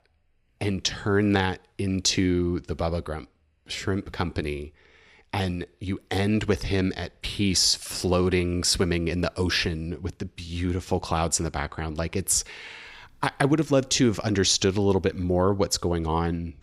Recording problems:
none

